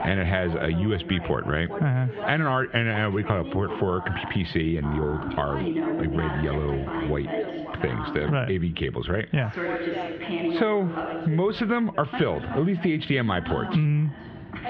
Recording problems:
squashed, flat; heavily, background pumping
muffled; slightly; fading above 3 kHz
background chatter; loud; throughout; 2 voices, 7 dB below the speech

